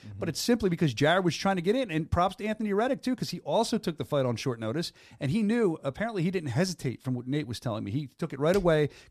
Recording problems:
none

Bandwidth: 14.5 kHz